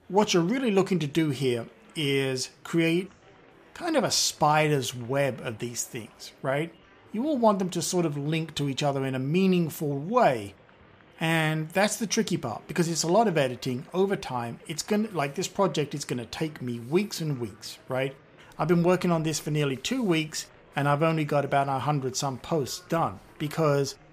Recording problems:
murmuring crowd; faint; throughout; 30 dB below the speech

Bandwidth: 14.5 kHz